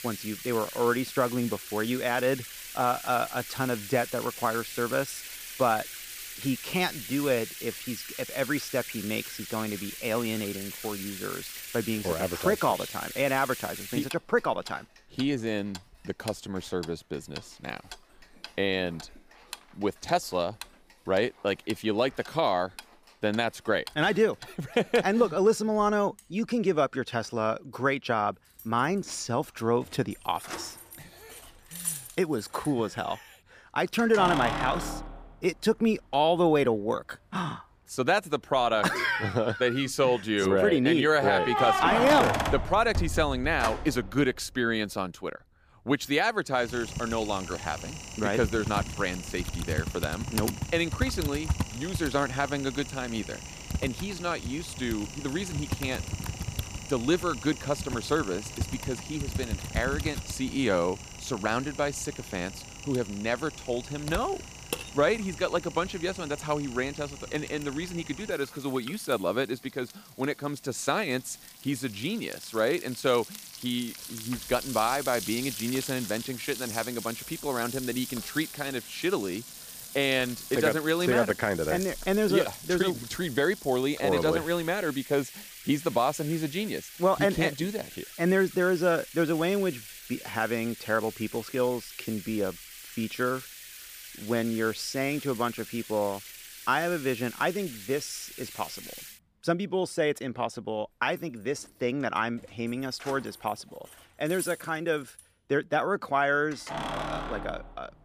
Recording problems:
household noises; loud; throughout; 9 dB below the speech

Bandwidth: 15 kHz